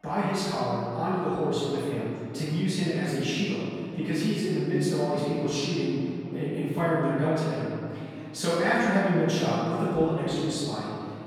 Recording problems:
room echo; strong; dies away in 2.5 s
off-mic speech; far
background chatter; faint; throughout; 4 voices, 25 dB below the speech

